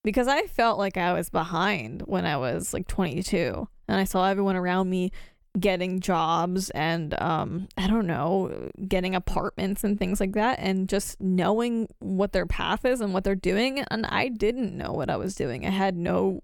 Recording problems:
none

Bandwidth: 17.5 kHz